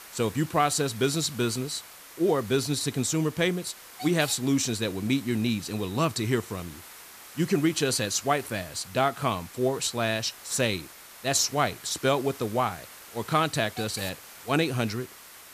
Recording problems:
hiss; noticeable; throughout; 15 dB below the speech

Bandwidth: 14.5 kHz